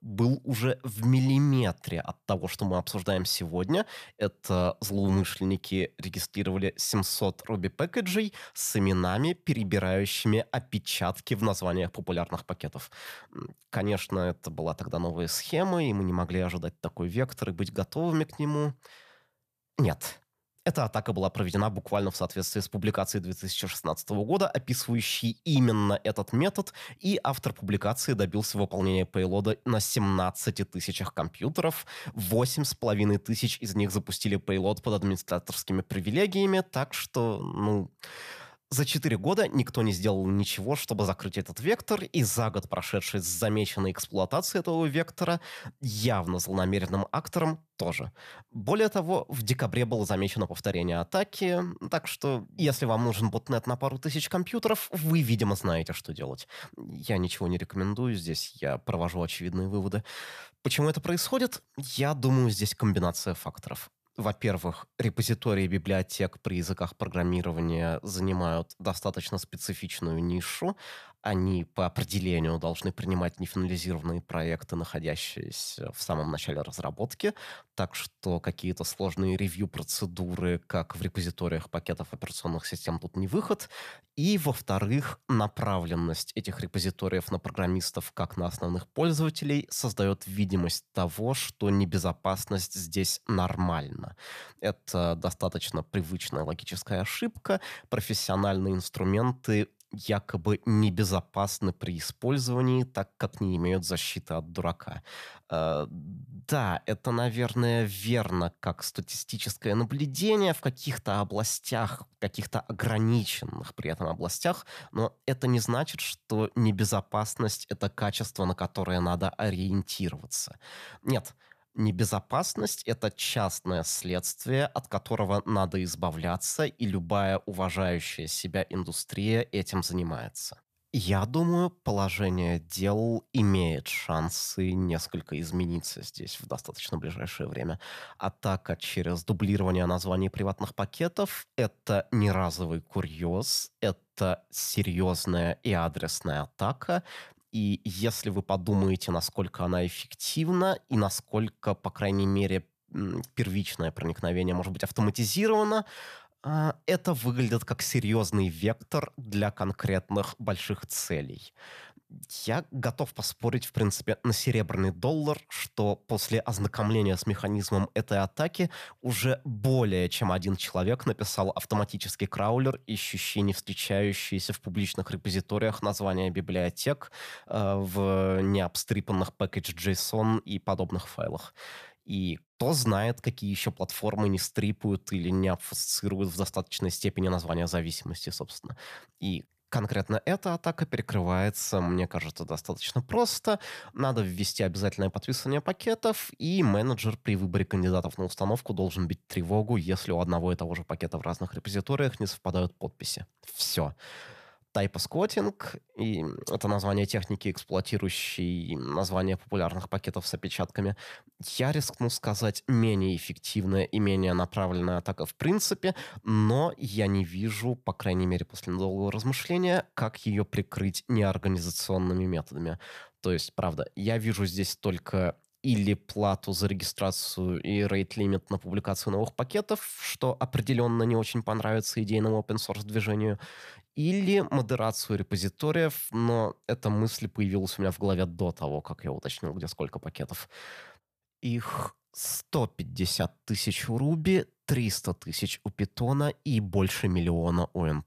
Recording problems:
none

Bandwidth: 14.5 kHz